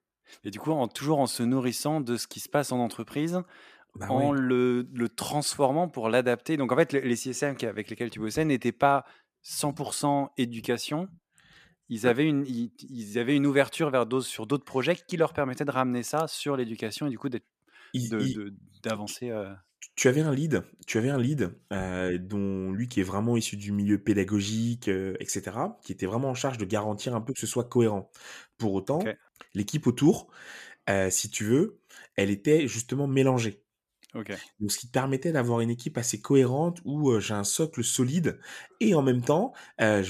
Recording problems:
abrupt cut into speech; at the end

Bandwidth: 14.5 kHz